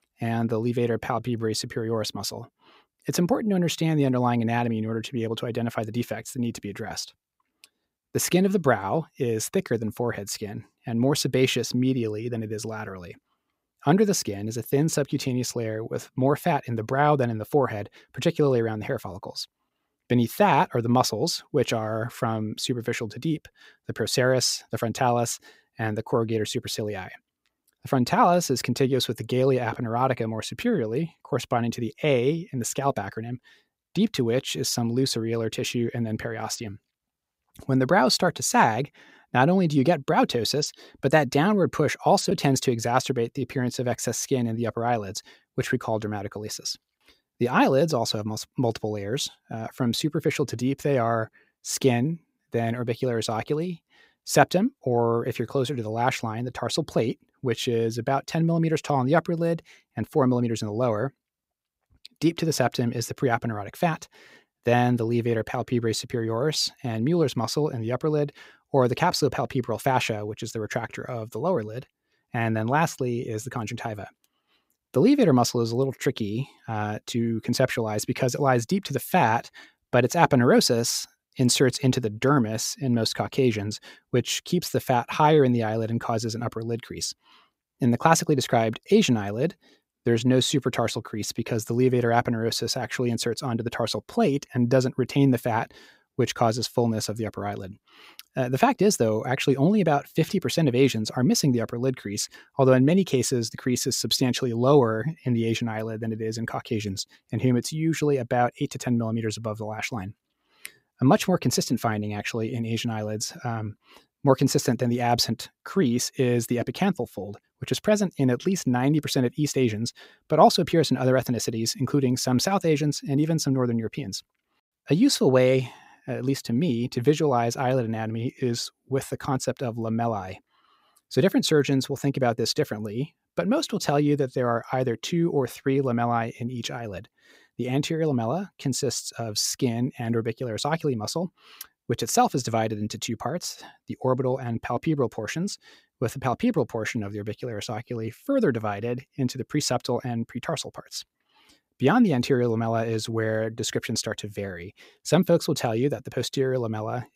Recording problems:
none

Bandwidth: 15.5 kHz